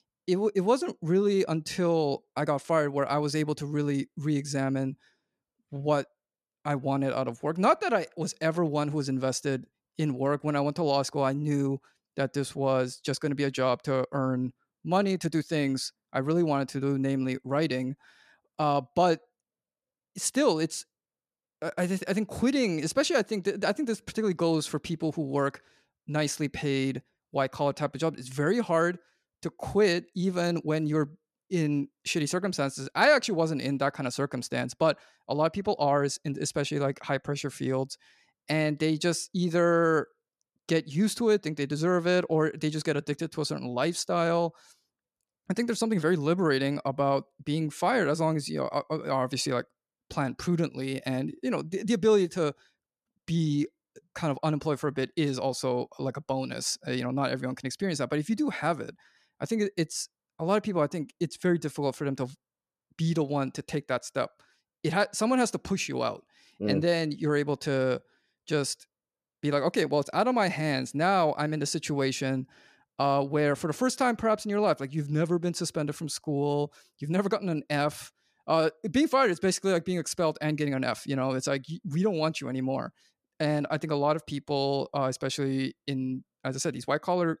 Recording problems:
none

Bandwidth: 14.5 kHz